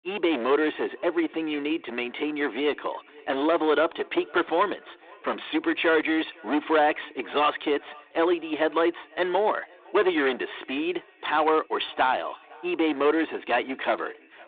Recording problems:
echo of what is said; faint; throughout; 510 ms later, 25 dB below the speech
phone-call audio; nothing above 3.5 kHz
distortion; slight; 8% of the sound clipped

